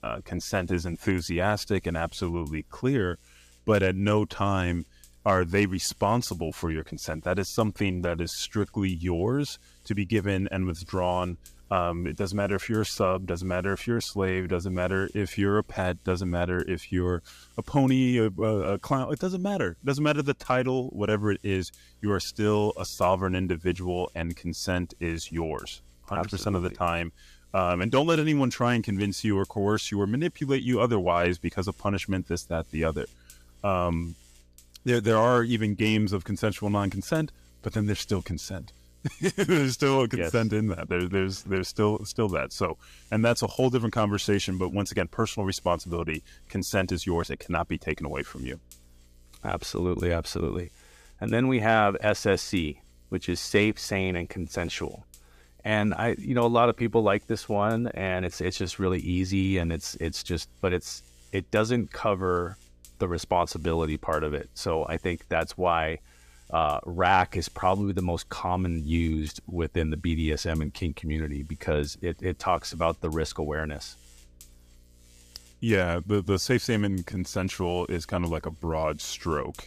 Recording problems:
electrical hum; faint; throughout; 60 Hz, 30 dB below the speech

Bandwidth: 14.5 kHz